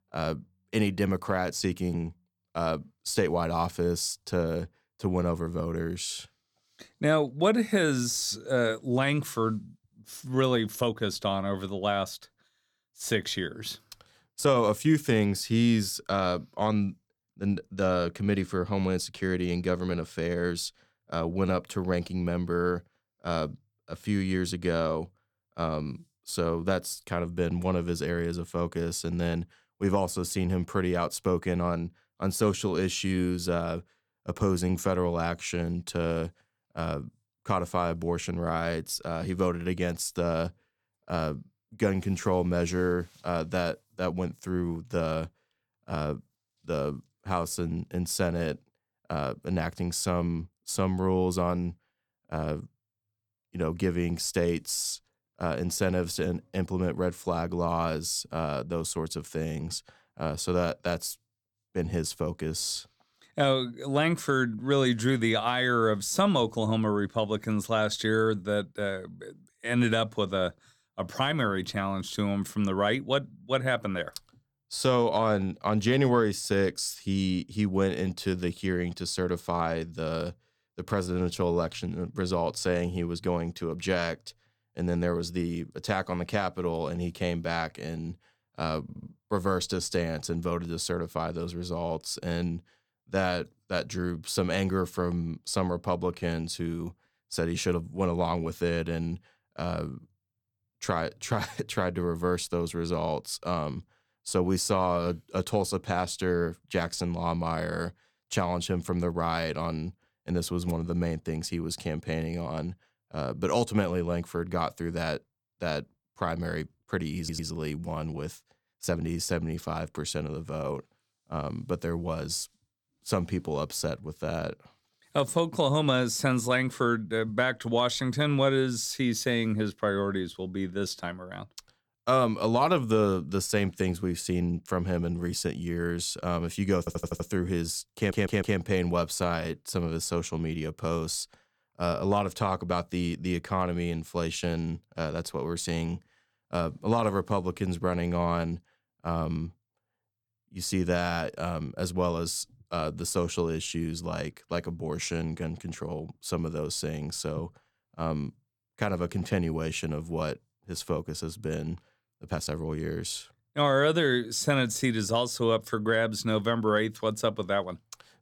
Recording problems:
uneven, jittery; strongly; from 4 s to 2:43
audio stuttering; 4 times, first at 1:29

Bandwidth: 18.5 kHz